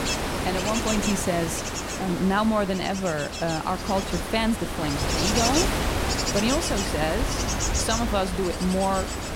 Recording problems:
wind noise on the microphone; heavy; as loud as the speech

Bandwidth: 16 kHz